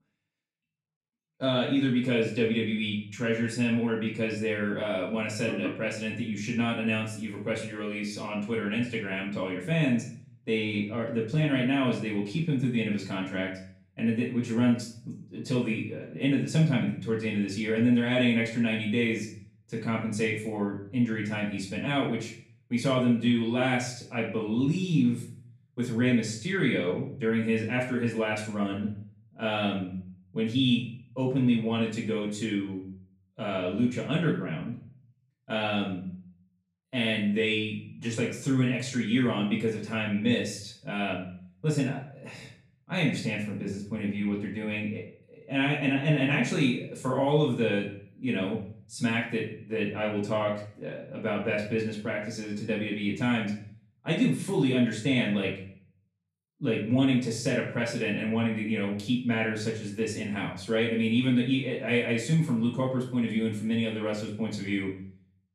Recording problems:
off-mic speech; far
room echo; noticeable; dies away in 0.5 s

